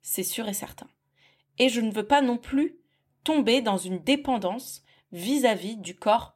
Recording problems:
none

